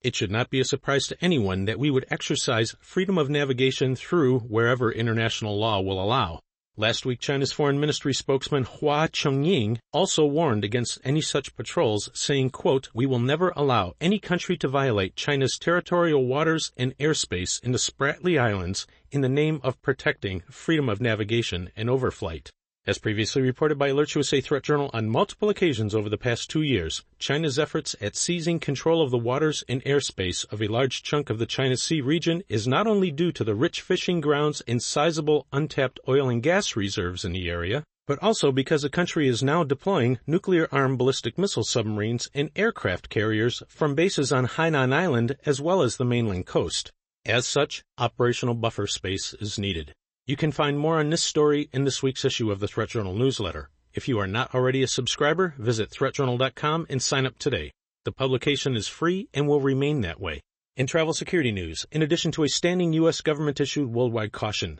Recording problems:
garbled, watery; slightly; nothing above 8 kHz

